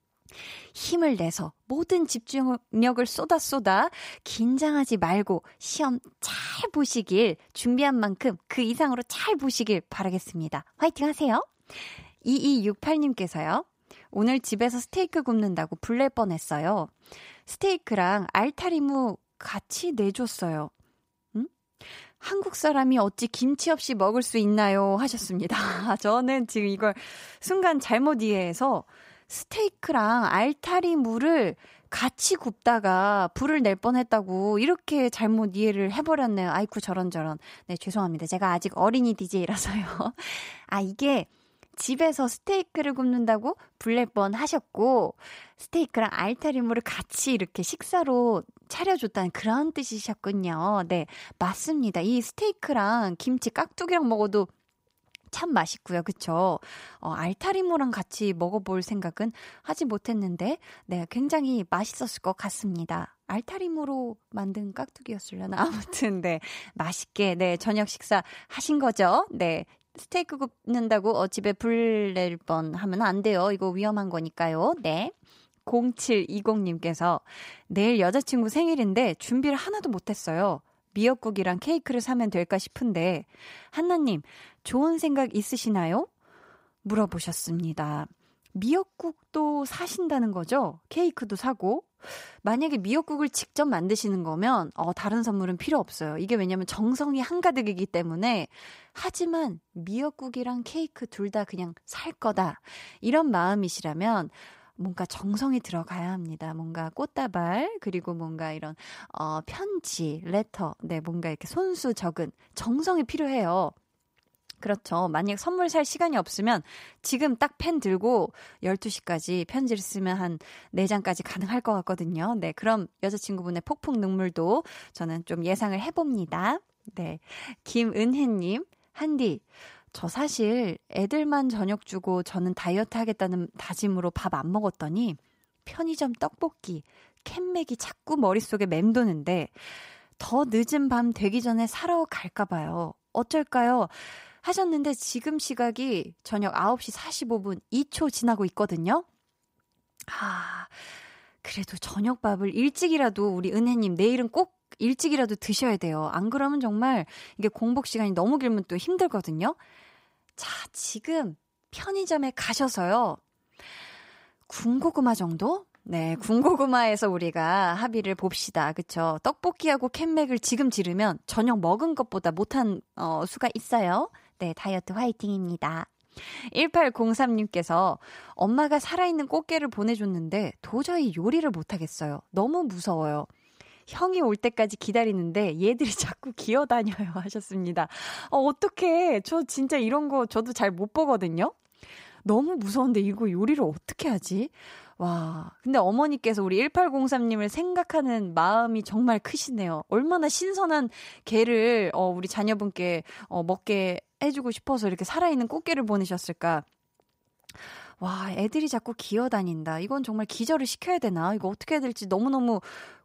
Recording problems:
none

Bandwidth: 15.5 kHz